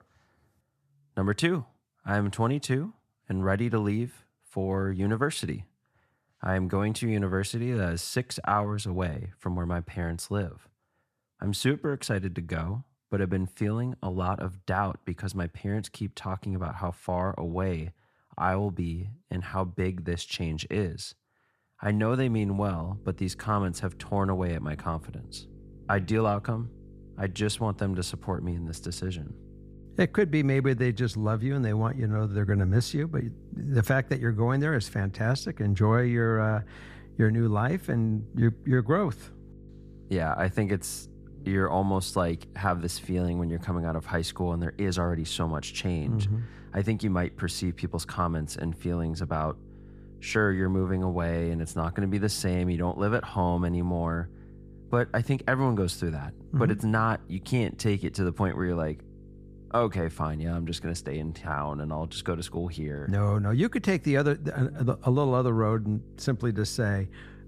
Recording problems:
electrical hum; faint; from 22 s on; 50 Hz, 25 dB below the speech

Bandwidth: 14.5 kHz